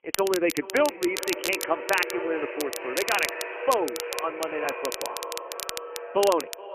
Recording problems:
phone-call audio; poor line; nothing above 3 kHz
echo of what is said; strong; throughout; 430 ms later, 8 dB below the speech
crackle, like an old record; loud; 7 dB below the speech

